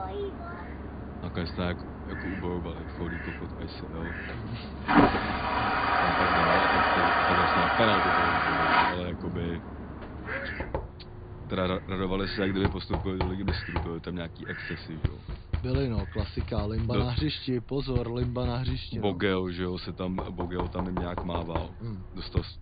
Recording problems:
high frequencies cut off; severe; nothing above 4.5 kHz
household noises; very loud; throughout; 4 dB above the speech
animal sounds; loud; throughout; 10 dB below the speech

